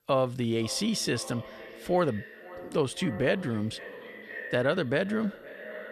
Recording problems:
echo of what is said; noticeable; throughout; 510 ms later, 15 dB below the speech

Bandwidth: 13.5 kHz